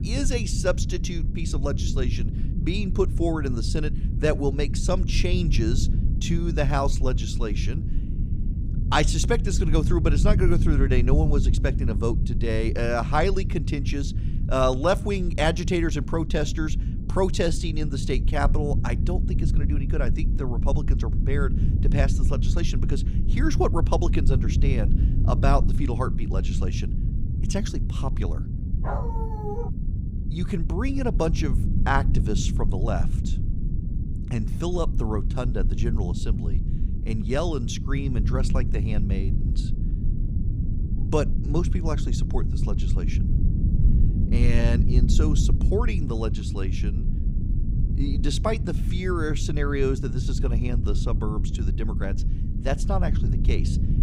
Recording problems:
low rumble; loud; throughout; 10 dB below the speech
dog barking; noticeable; at 29 s; peak 5 dB below the speech

